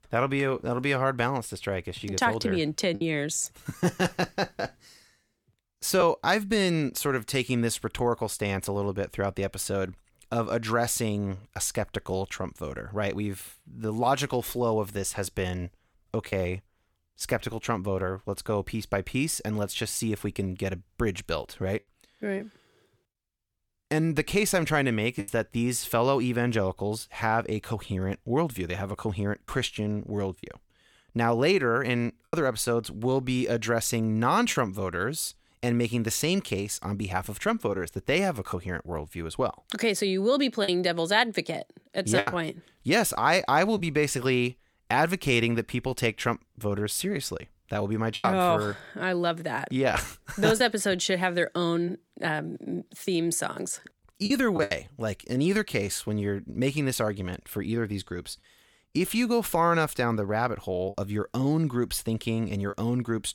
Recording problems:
choppy; occasionally; 2% of the speech affected

